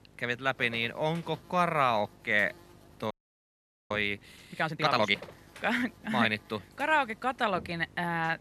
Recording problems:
electrical hum; faint; throughout; 50 Hz, 25 dB below the speech
audio freezing; at 3 s for 1 s

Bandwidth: 13.5 kHz